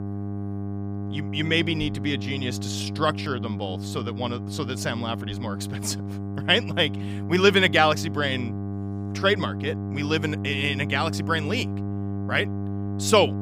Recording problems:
electrical hum; noticeable; throughout; 50 Hz, 15 dB below the speech

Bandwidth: 15.5 kHz